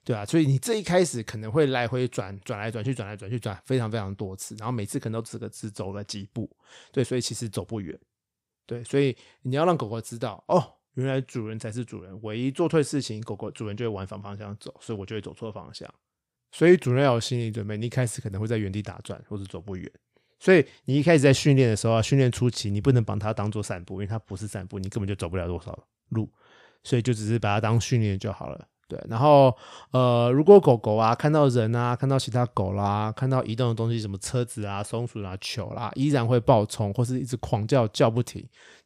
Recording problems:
none

